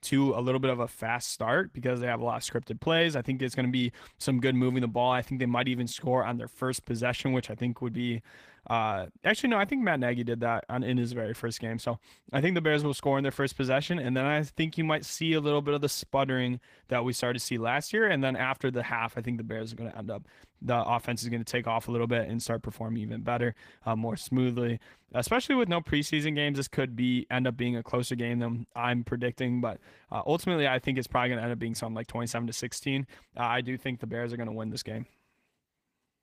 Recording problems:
garbled, watery; slightly; nothing above 15 kHz

